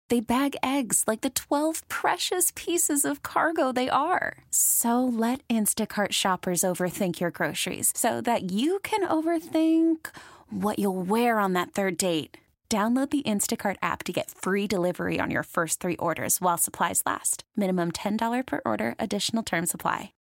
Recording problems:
none

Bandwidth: 16 kHz